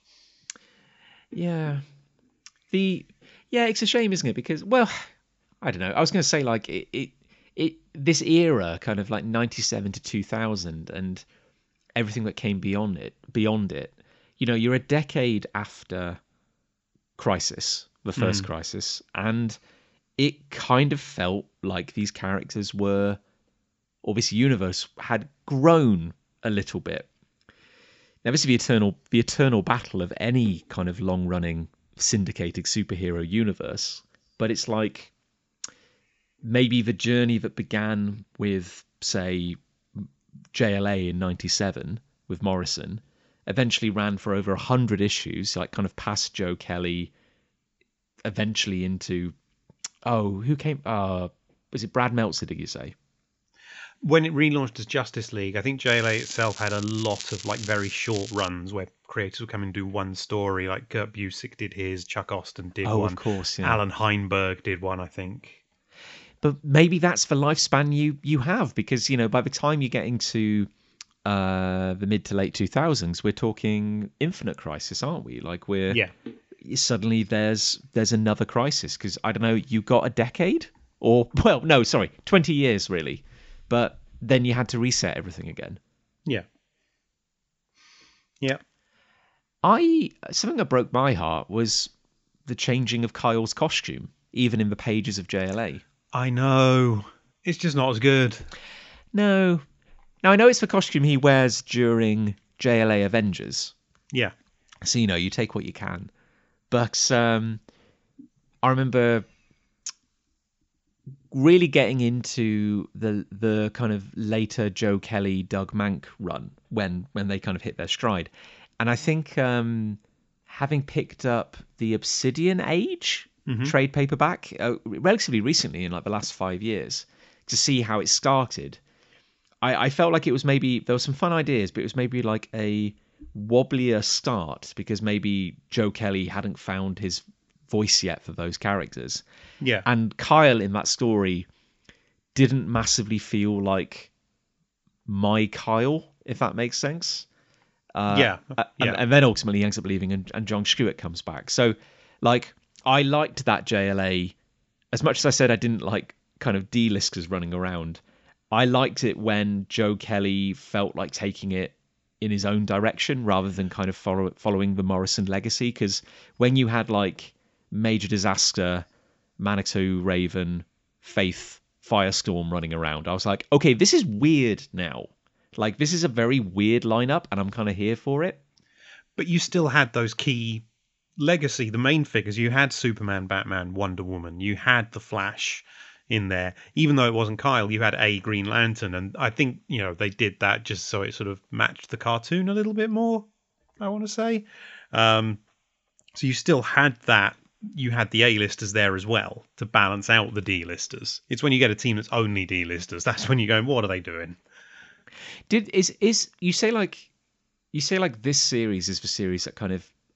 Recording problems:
high frequencies cut off; noticeable; nothing above 7.5 kHz
crackling; noticeable; from 56 to 58 s; 15 dB below the speech

